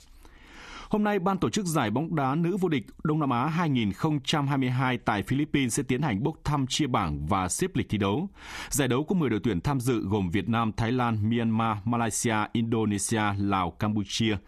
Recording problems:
squashed, flat; somewhat

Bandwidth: 14 kHz